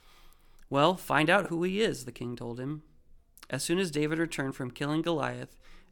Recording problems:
none

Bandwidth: 17.5 kHz